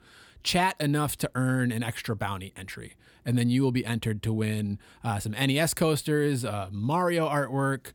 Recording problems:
none

